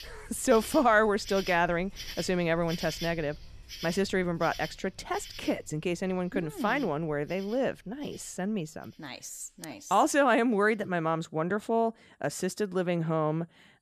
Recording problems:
animal sounds; noticeable; throughout; 15 dB below the speech

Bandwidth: 14.5 kHz